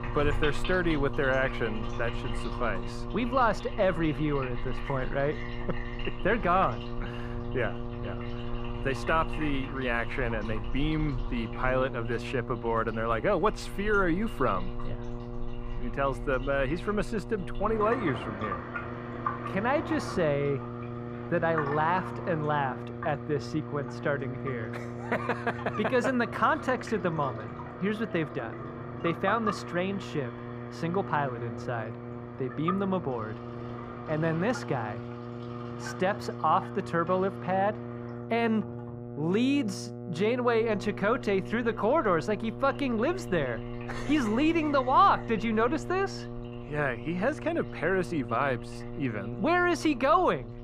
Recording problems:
muffled; slightly; fading above 2.5 kHz
electrical hum; noticeable; throughout; 60 Hz, 15 dB below the speech
household noises; noticeable; throughout; 10 dB below the speech

